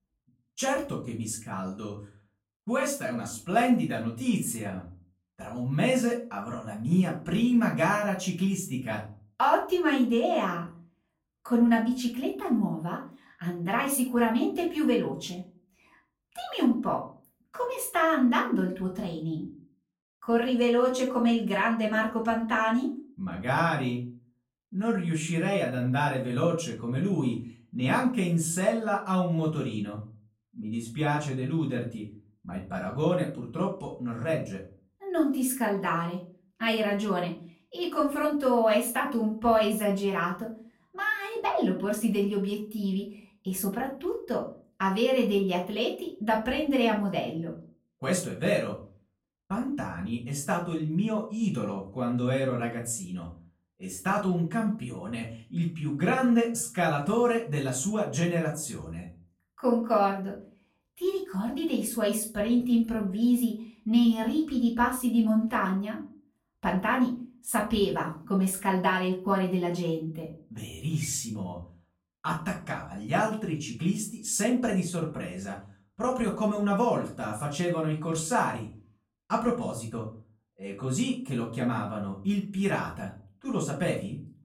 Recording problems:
off-mic speech; far
room echo; slight; dies away in 0.3 s

